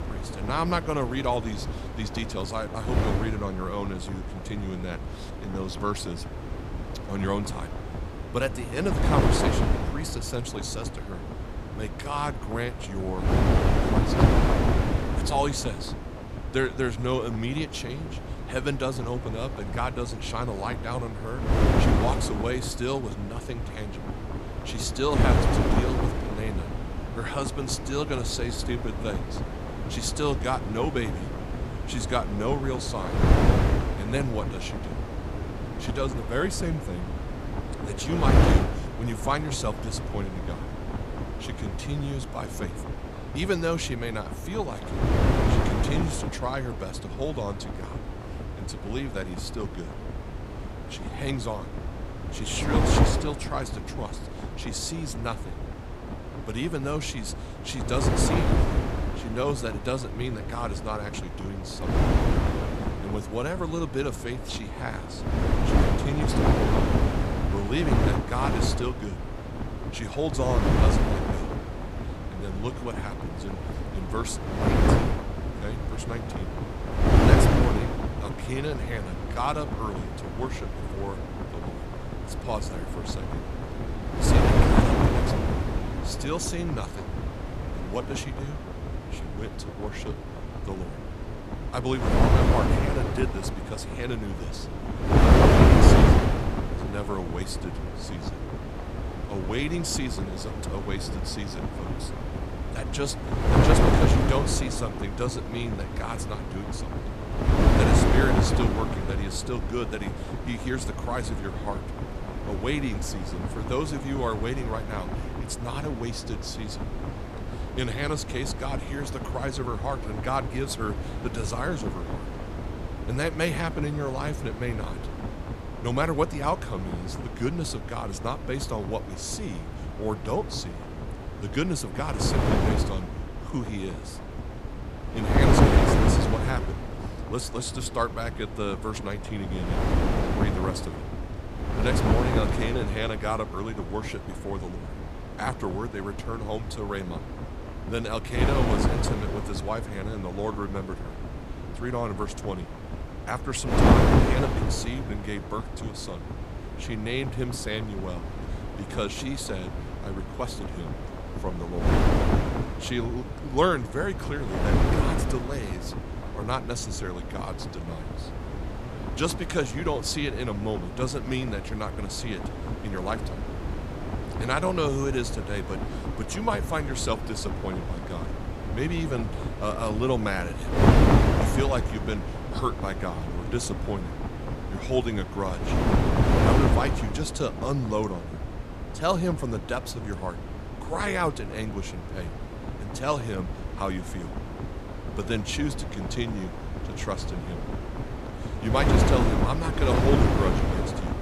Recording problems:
wind noise on the microphone; heavy; 1 dB below the speech

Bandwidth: 15 kHz